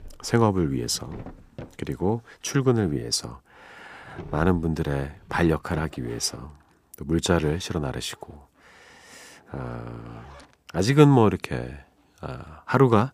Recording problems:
household noises; faint; throughout; 20 dB below the speech

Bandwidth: 15 kHz